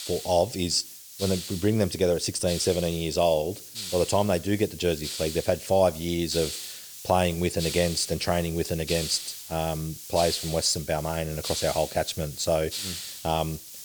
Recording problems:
hiss; loud; throughout; 9 dB below the speech

